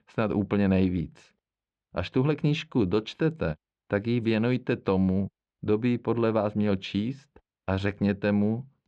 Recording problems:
muffled; slightly; fading above 3.5 kHz

